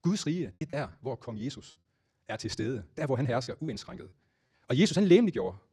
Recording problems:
wrong speed, natural pitch; too fast; 1.6 times normal speed
choppy; occasionally; 3% of the speech affected

